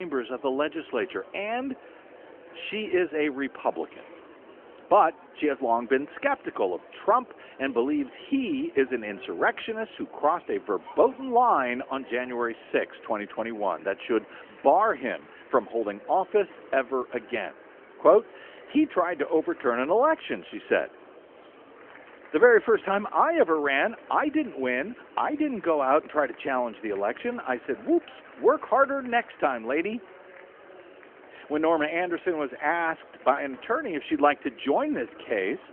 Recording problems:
phone-call audio; nothing above 3 kHz
murmuring crowd; faint; throughout; 20 dB below the speech
abrupt cut into speech; at the start

